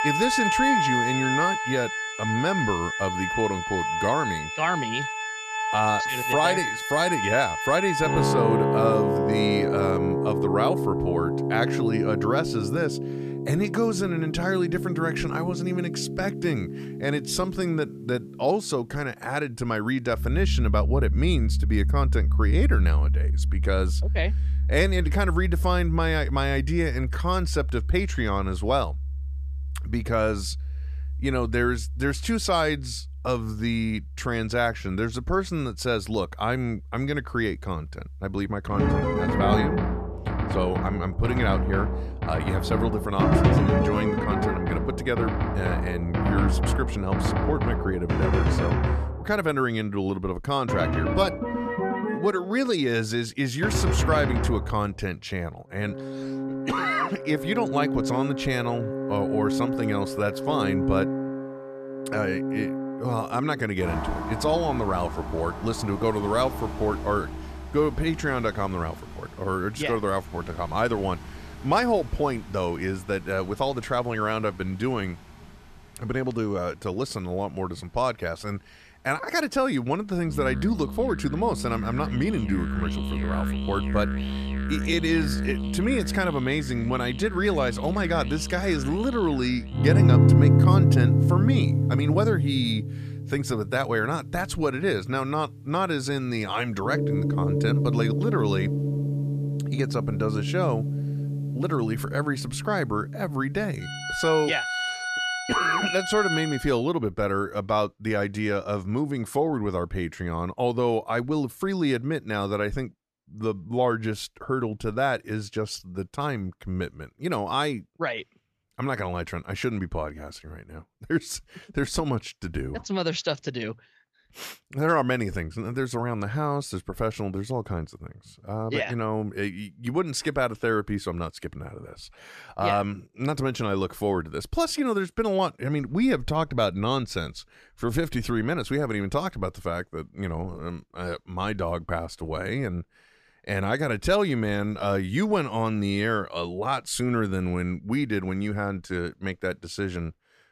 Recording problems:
background music; very loud; until 1:47; 1 dB above the speech

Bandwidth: 14.5 kHz